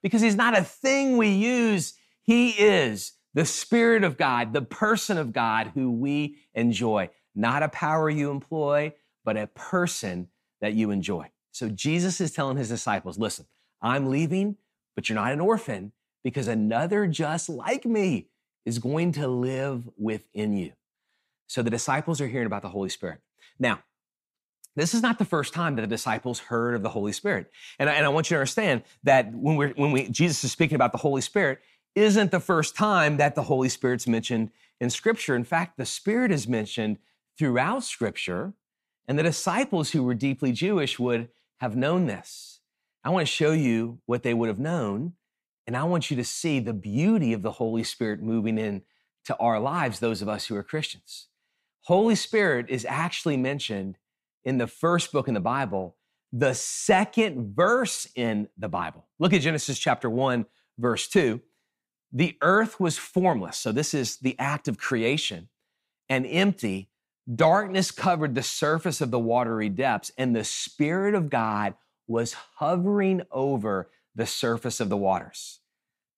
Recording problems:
none

